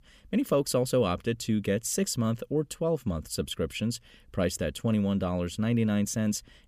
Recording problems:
none

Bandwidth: 15 kHz